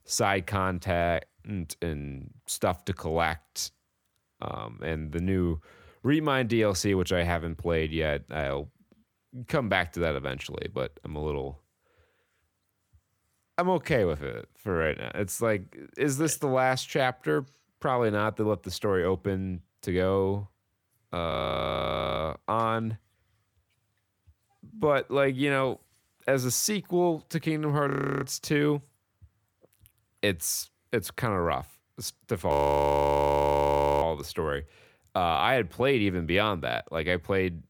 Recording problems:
audio freezing; at 21 s for 1 s, at 28 s and at 33 s for 1.5 s

